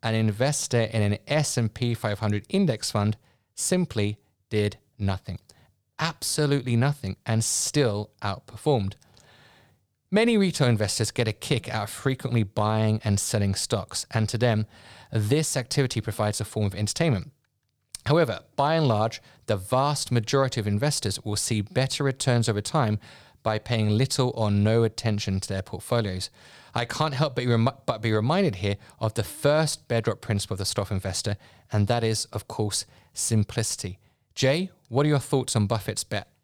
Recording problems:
none

